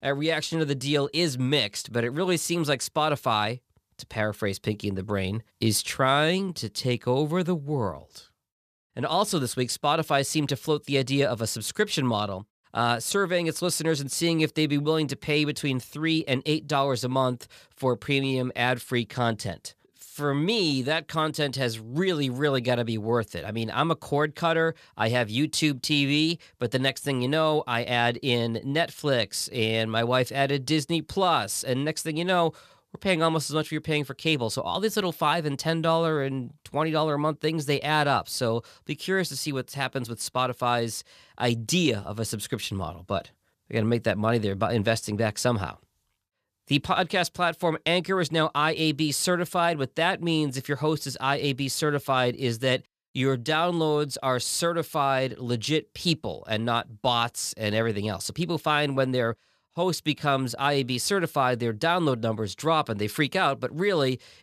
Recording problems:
none

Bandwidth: 14.5 kHz